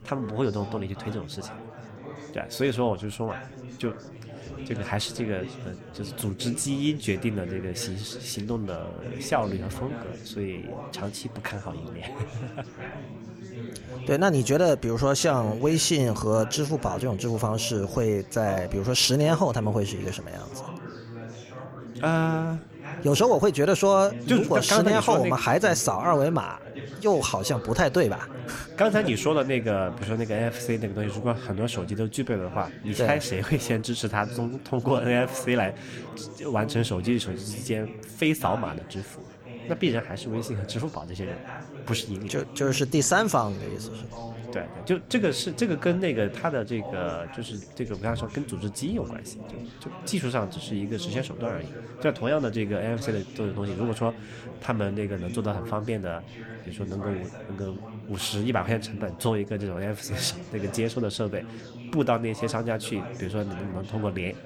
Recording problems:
chatter from many people; noticeable; throughout; 15 dB below the speech

